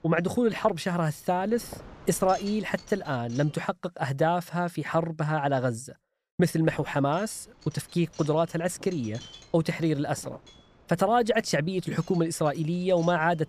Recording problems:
wind noise on the microphone; occasional gusts; until 3.5 s and from 6.5 s on; 20 dB below the speech

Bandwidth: 14.5 kHz